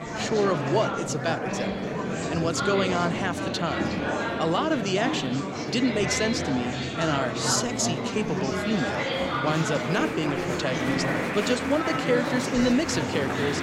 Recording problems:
murmuring crowd; loud; throughout; 1 dB below the speech

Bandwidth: 16.5 kHz